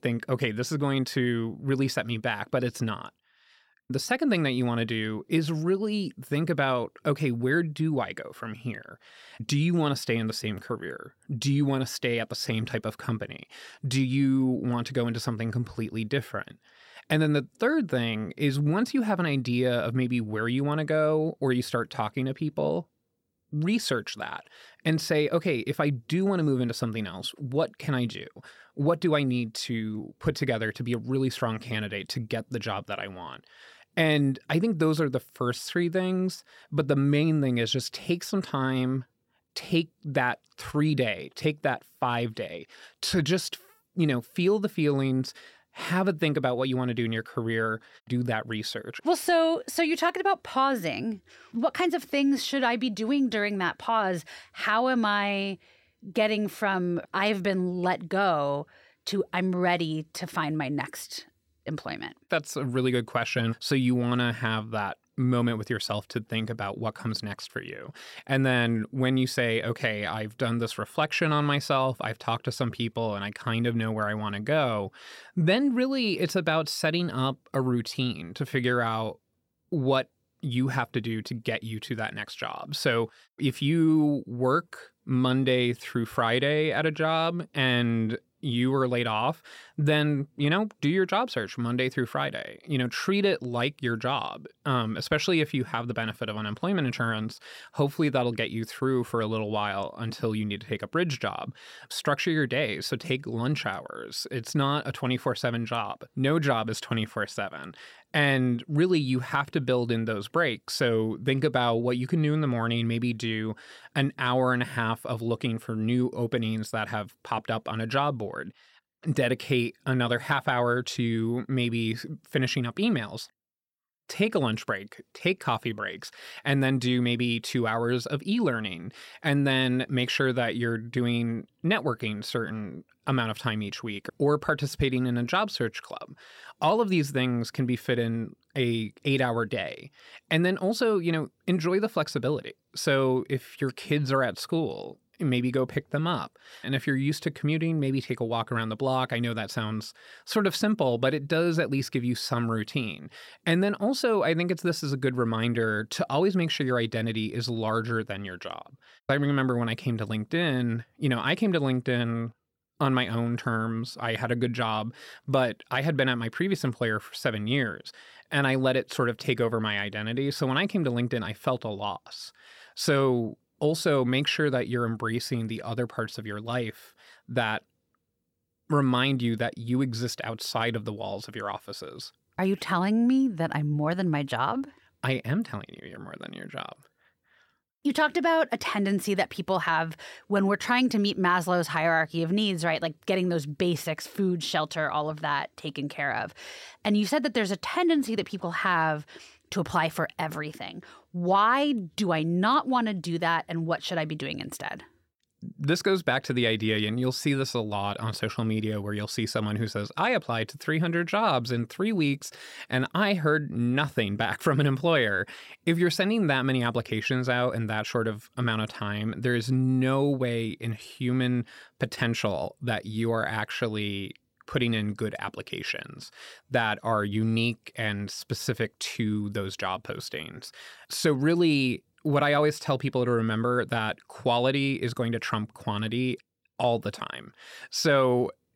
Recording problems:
none

